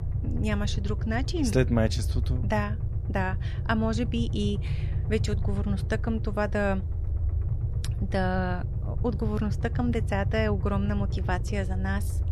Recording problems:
low rumble; noticeable; throughout; 15 dB below the speech

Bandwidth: 14 kHz